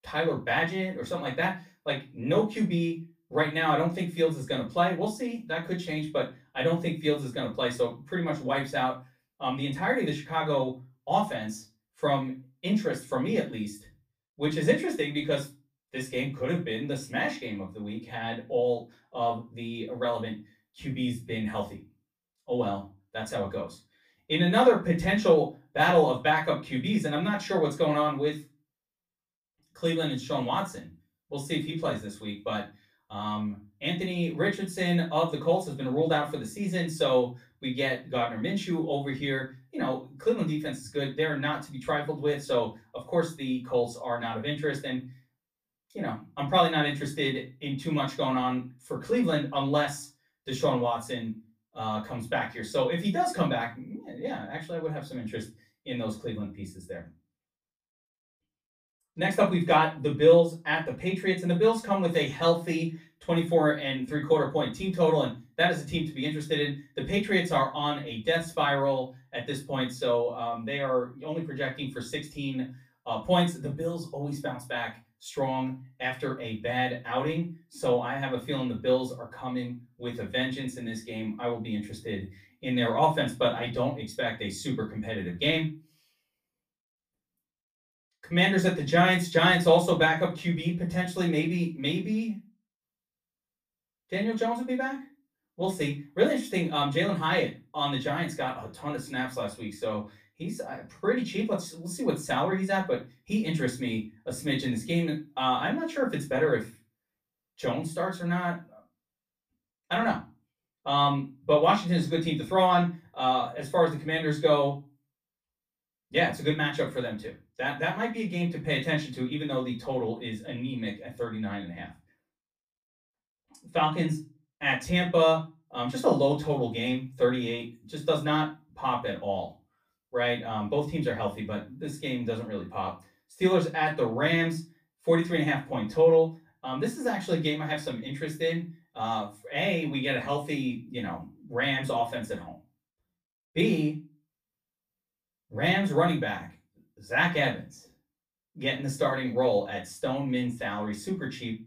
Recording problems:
off-mic speech; far
room echo; very slight; dies away in 0.3 s

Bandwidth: 15 kHz